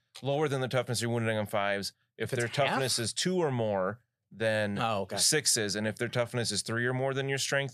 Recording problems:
none

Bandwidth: 15 kHz